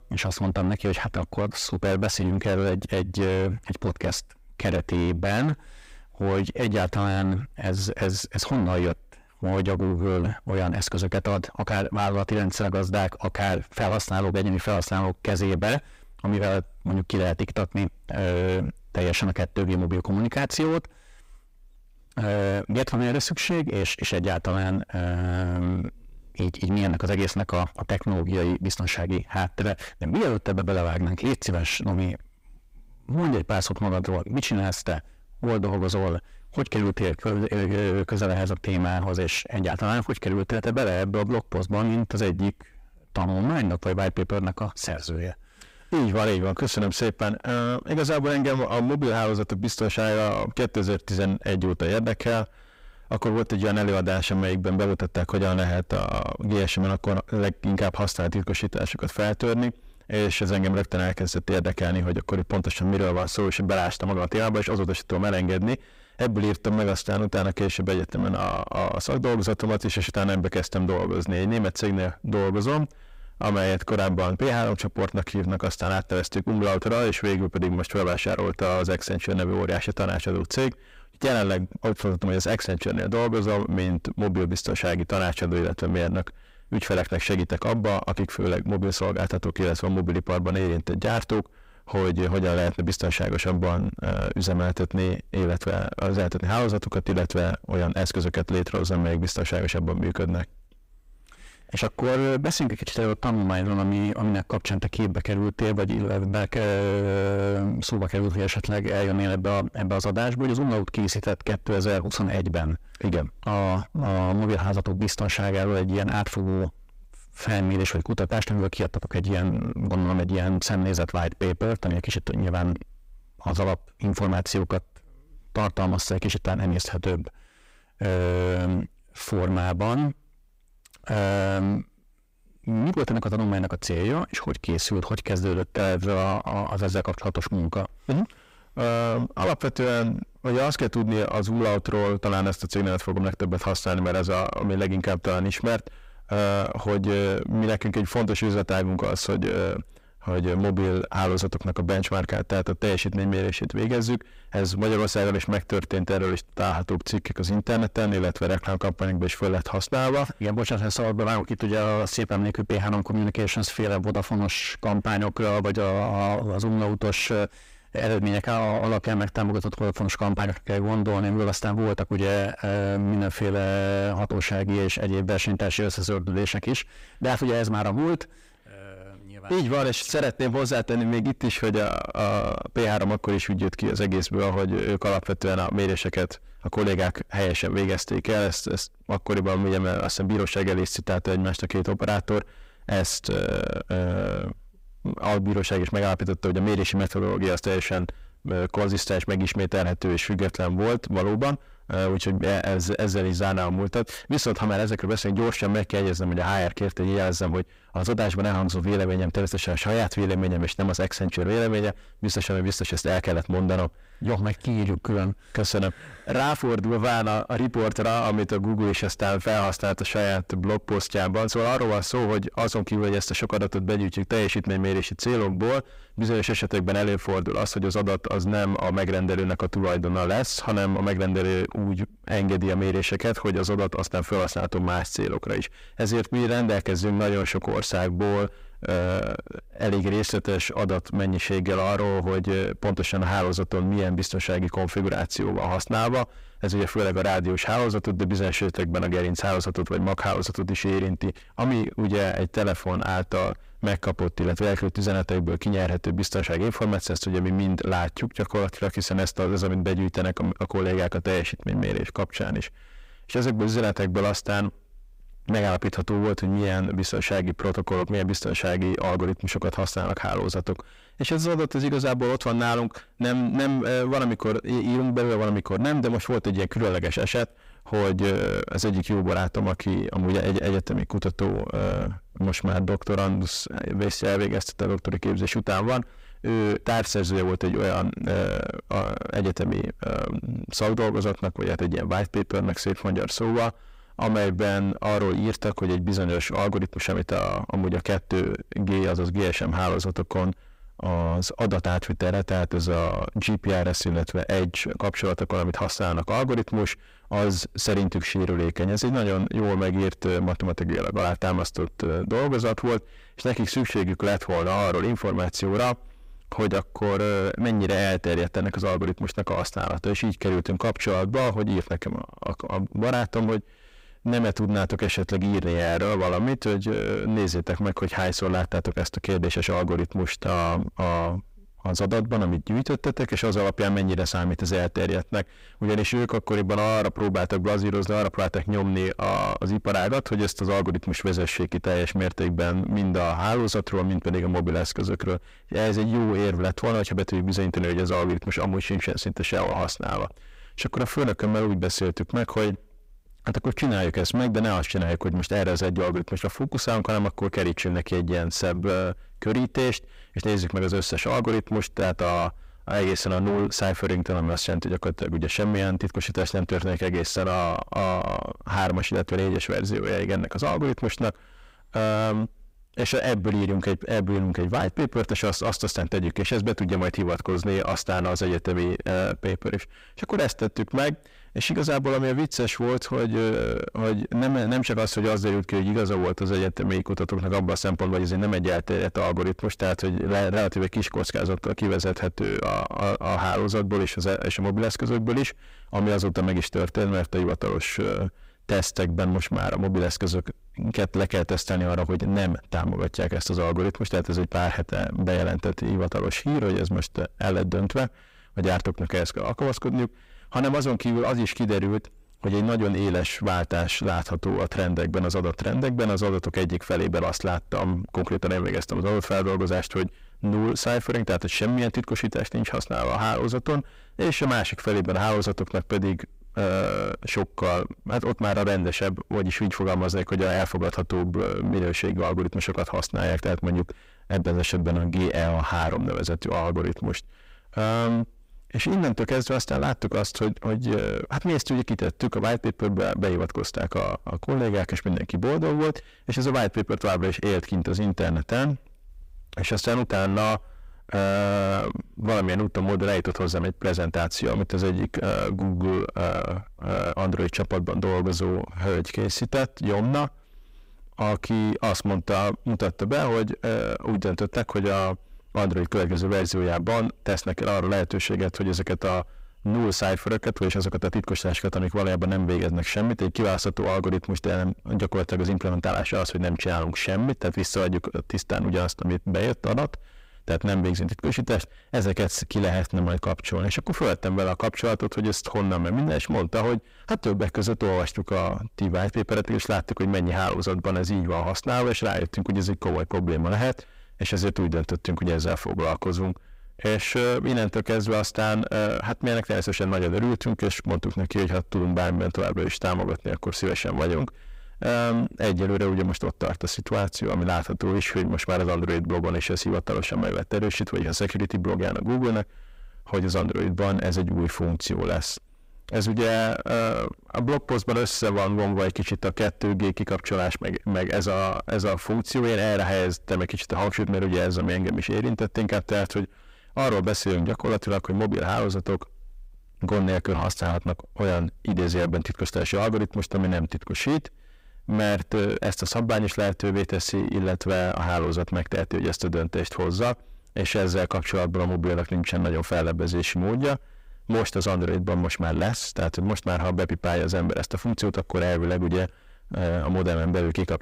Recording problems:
distortion; heavy; 7 dB below the speech

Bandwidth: 15.5 kHz